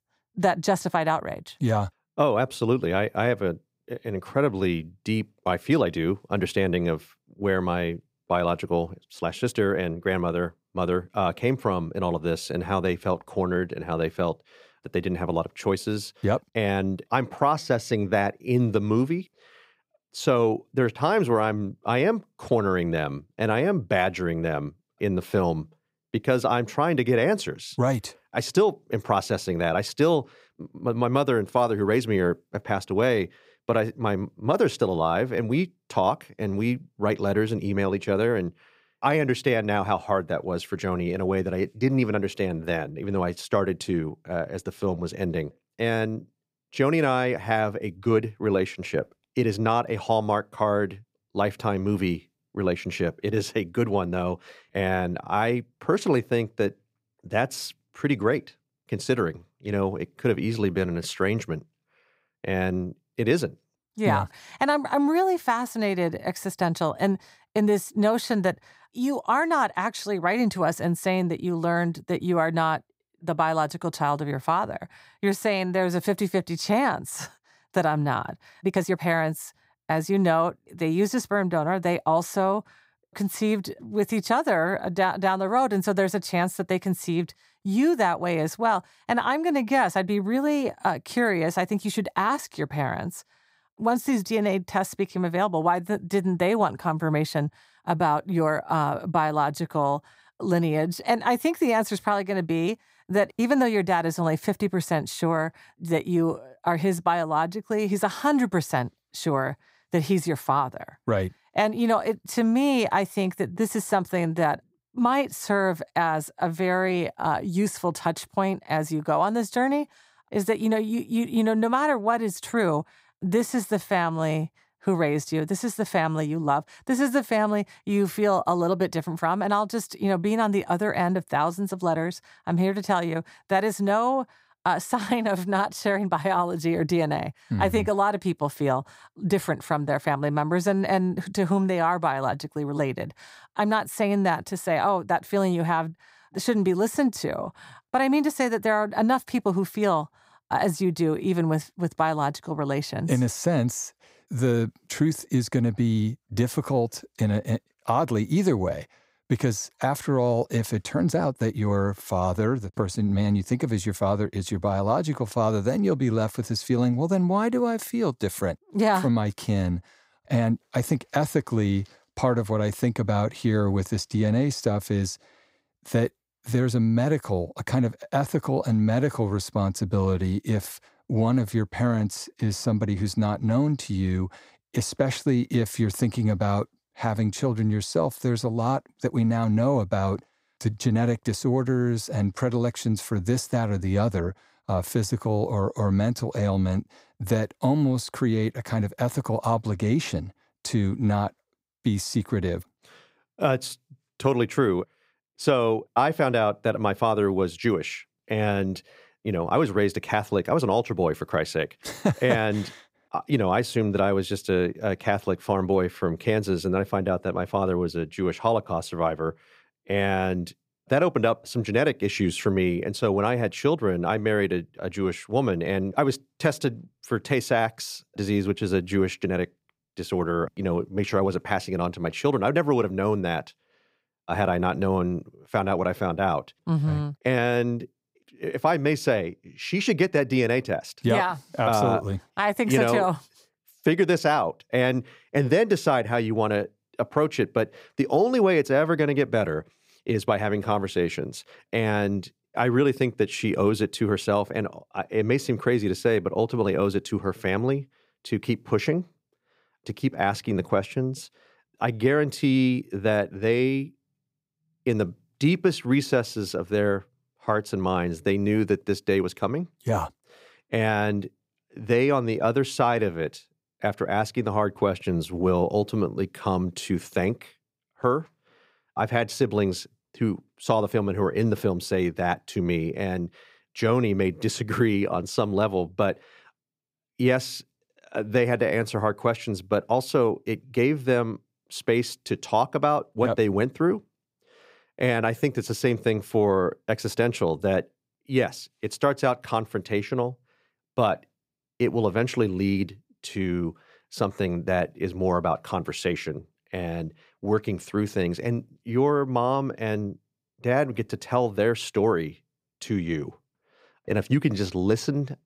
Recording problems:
uneven, jittery; strongly; from 20 s to 5:11

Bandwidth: 15.5 kHz